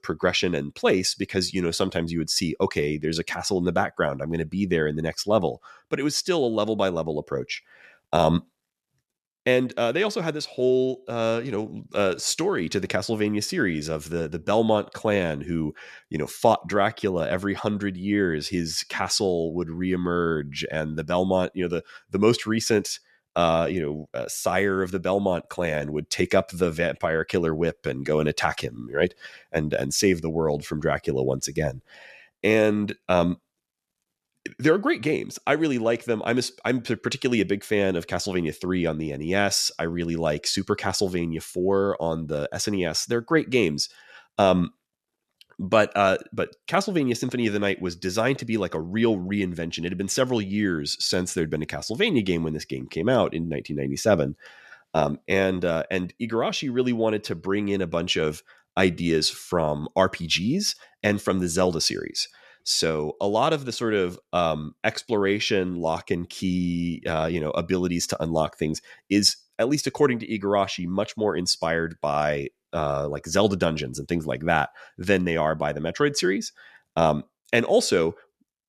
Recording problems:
none

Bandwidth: 13.5 kHz